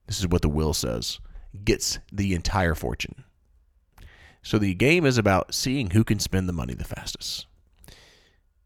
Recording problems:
none

